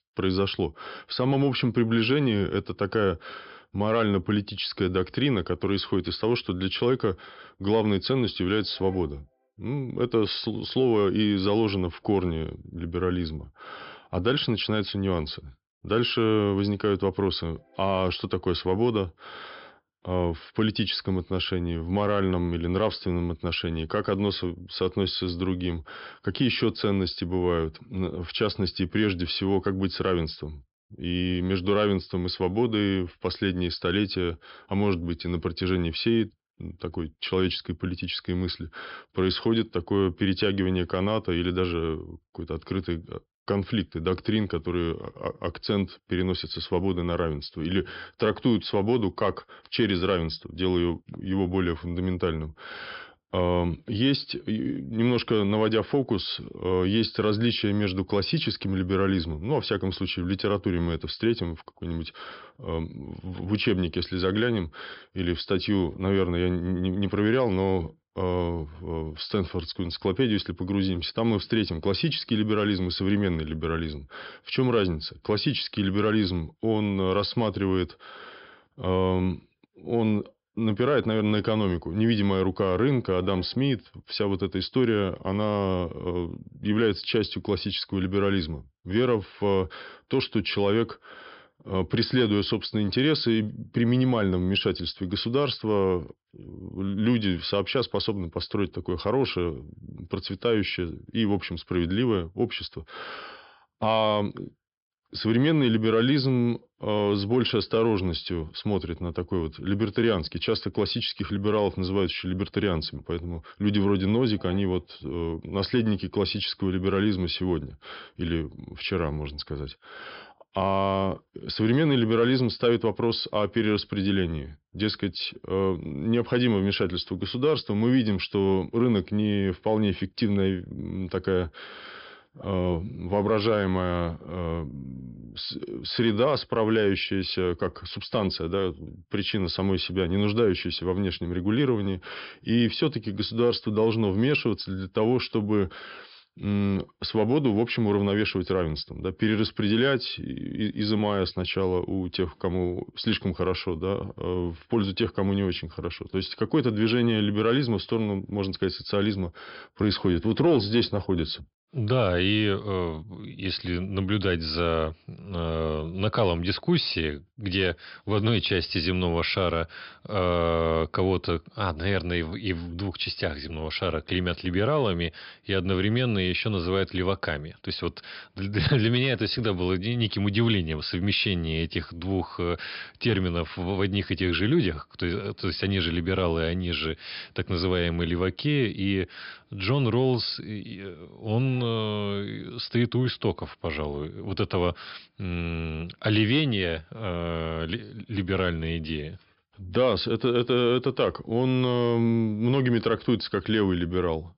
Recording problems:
high frequencies cut off; noticeable; nothing above 5.5 kHz

